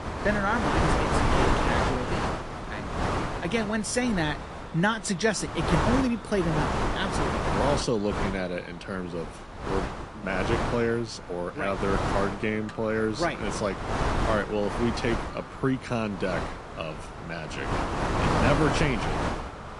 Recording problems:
echo of what is said; faint; throughout; 430 ms later, 25 dB below the speech
garbled, watery; slightly
wind noise on the microphone; heavy; 1 dB above the speech

